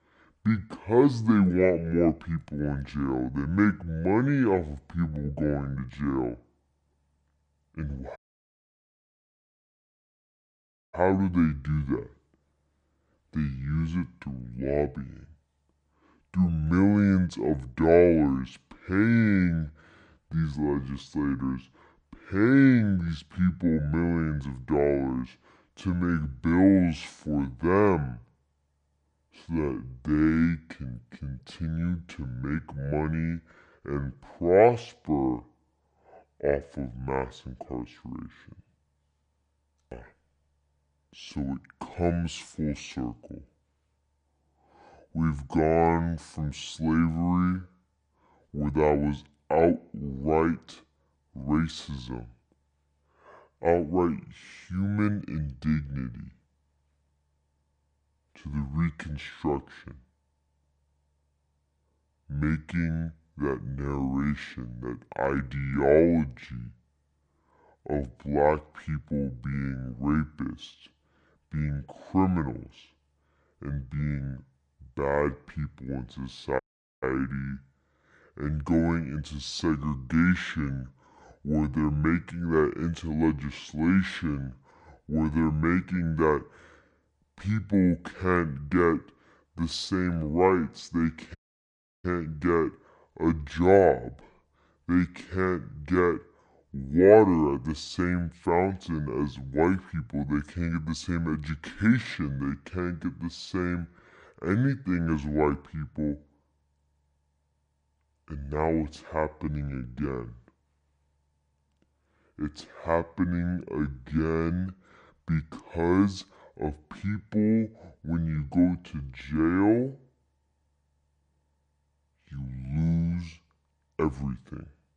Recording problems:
wrong speed and pitch; too slow and too low; 0.6 times normal speed
audio cutting out; at 8 s for 3 s, at 1:17 and at 1:31 for 0.5 s

